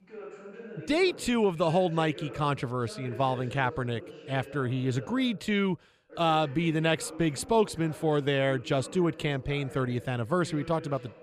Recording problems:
voice in the background; noticeable; throughout; 15 dB below the speech

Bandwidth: 15 kHz